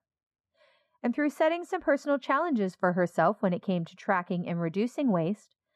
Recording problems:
muffled; very; fading above 2.5 kHz

